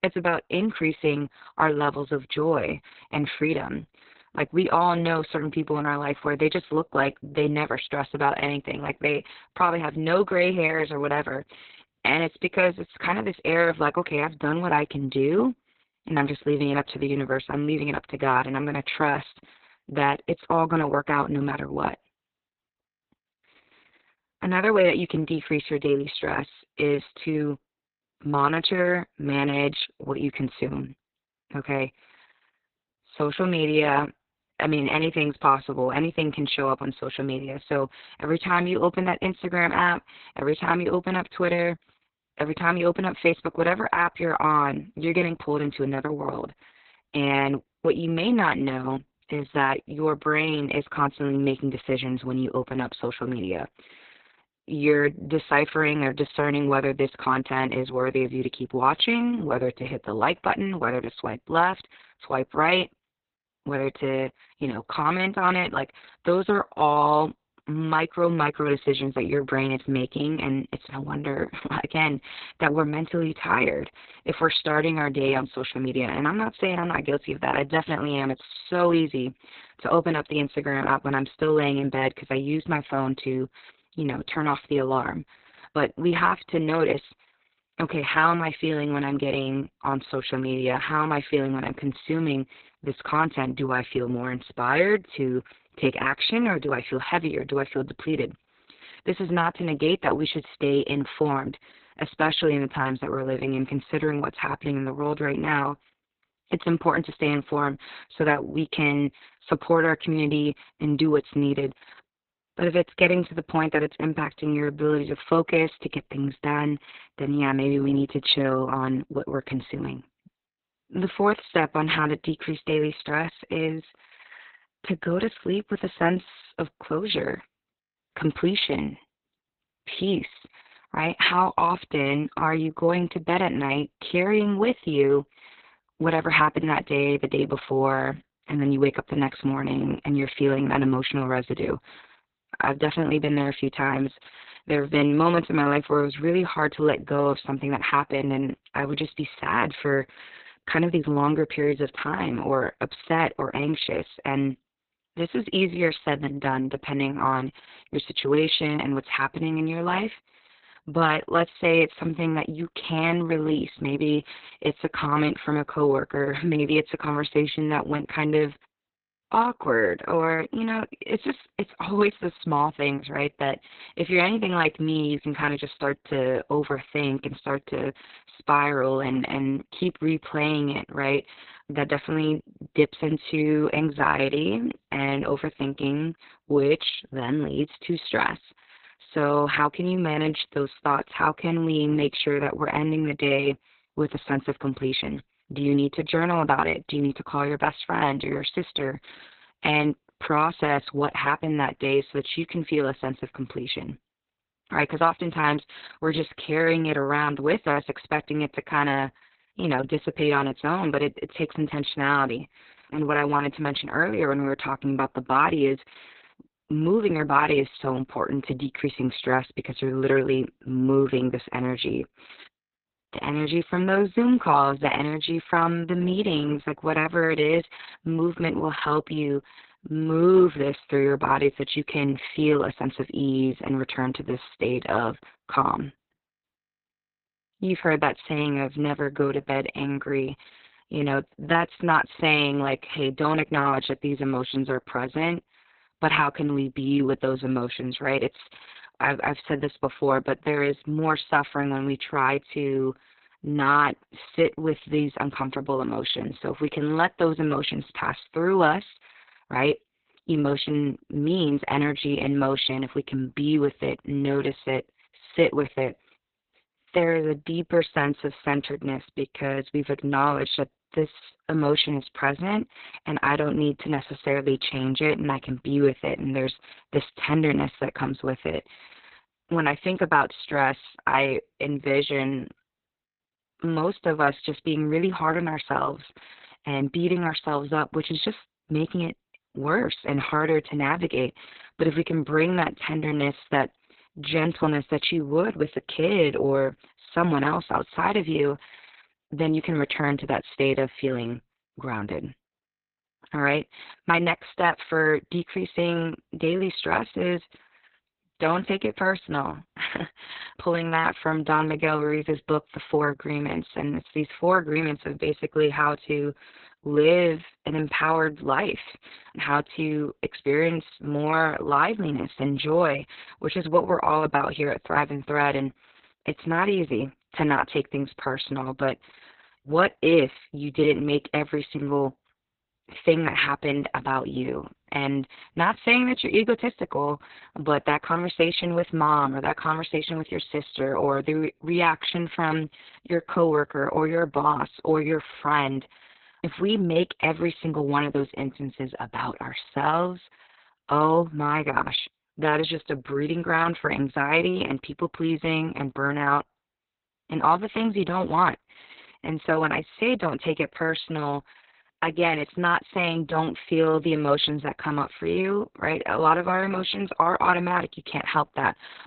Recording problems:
garbled, watery; badly; nothing above 4 kHz

